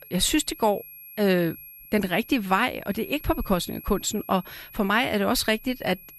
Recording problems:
high-pitched whine; noticeable; throughout; 11.5 kHz, 20 dB below the speech

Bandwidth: 14 kHz